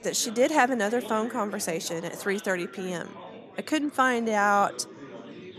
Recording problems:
chatter from many people; noticeable; throughout; 15 dB below the speech

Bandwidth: 13.5 kHz